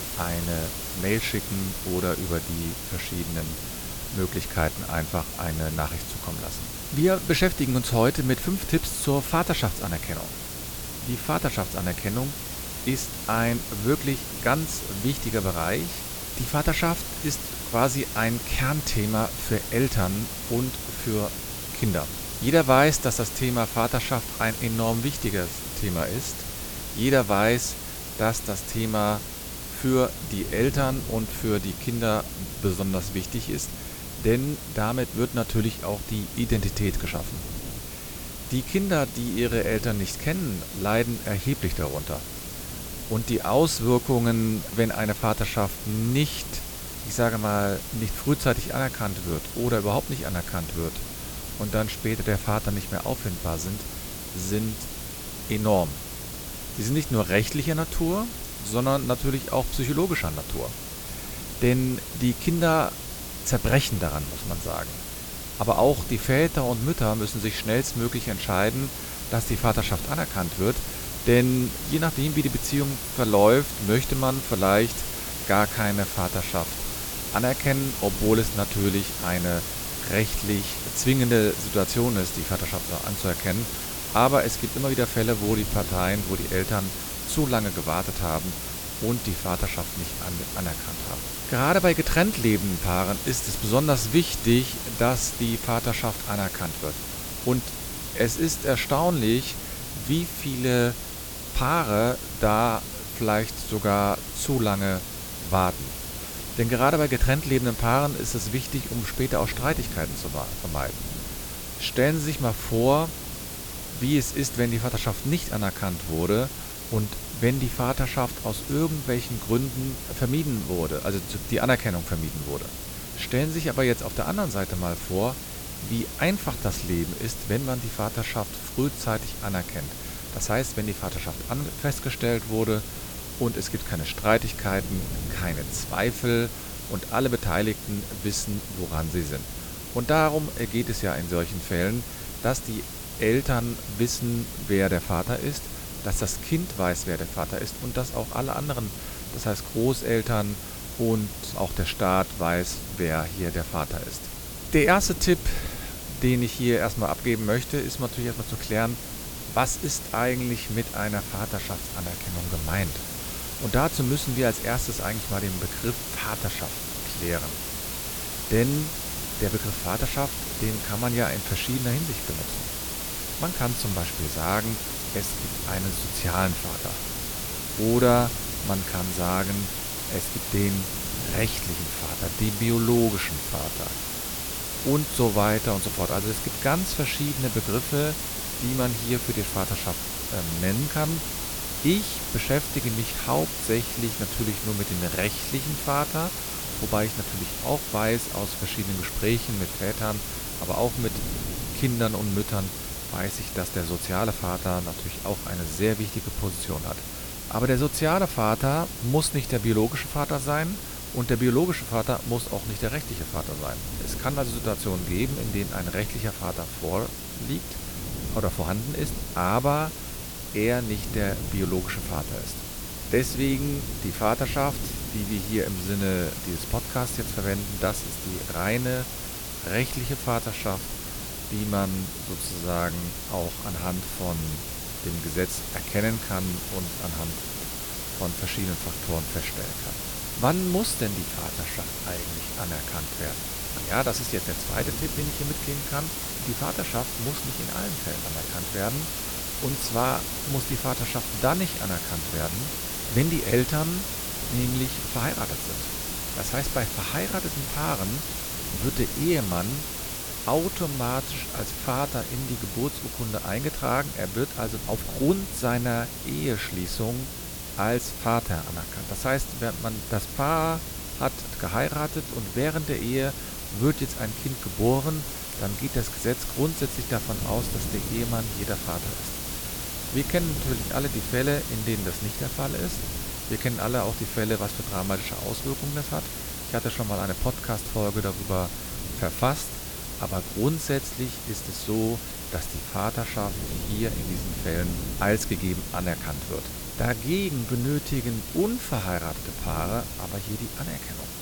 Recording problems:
hiss; loud; throughout; 5 dB below the speech
wind noise on the microphone; occasional gusts; 20 dB below the speech
electrical hum; faint; throughout; 60 Hz, 25 dB below the speech

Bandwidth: 18.5 kHz